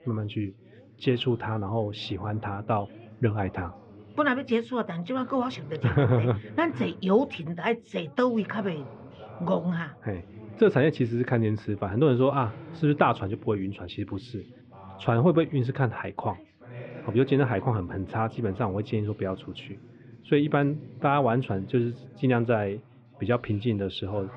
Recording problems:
muffled; very; fading above 3 kHz
background chatter; noticeable; throughout; 2 voices, 20 dB below the speech

